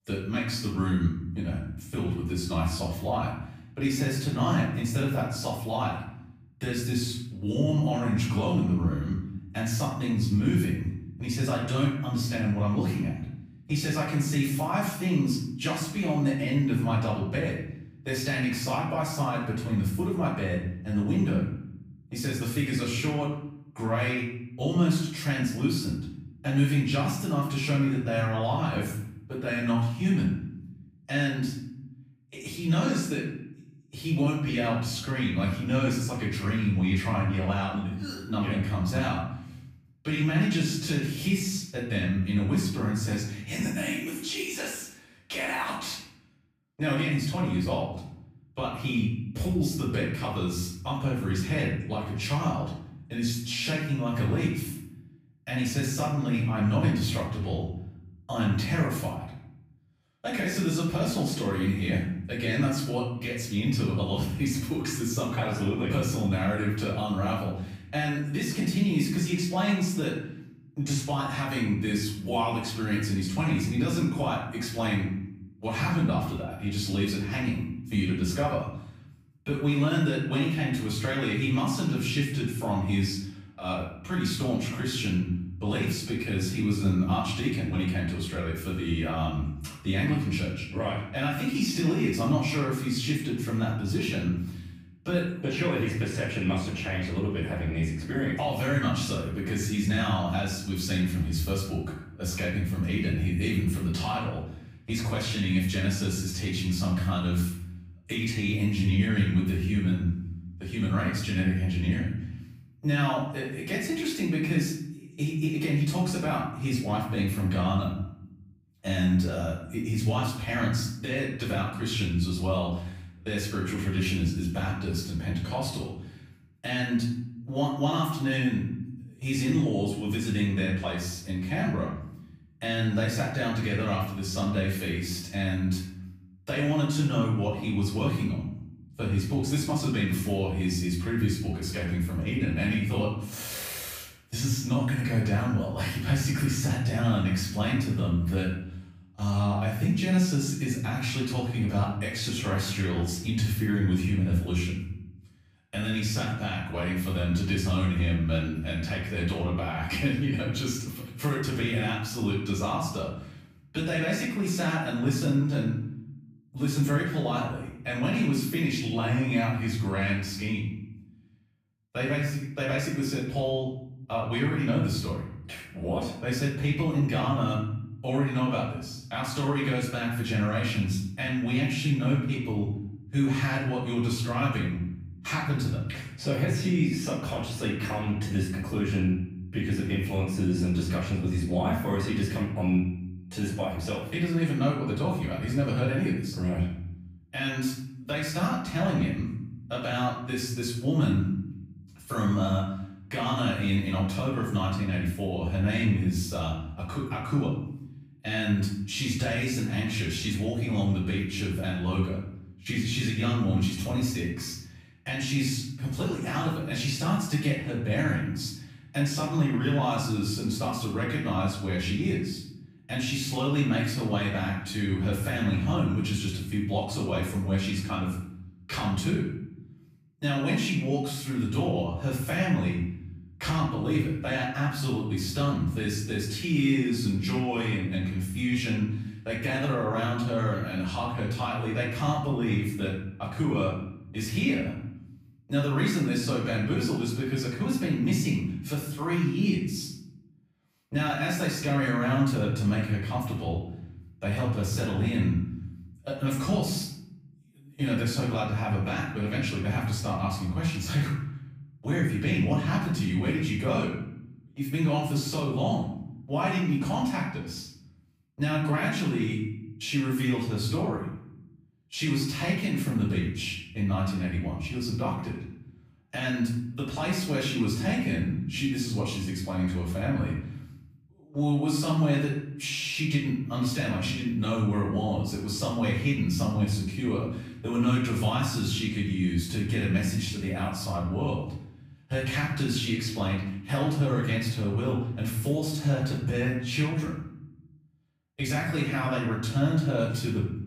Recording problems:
off-mic speech; far
room echo; noticeable; dies away in 0.8 s

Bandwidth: 15 kHz